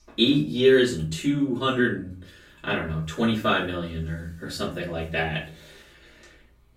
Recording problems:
off-mic speech; far
room echo; slight; dies away in 0.3 s

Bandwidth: 16 kHz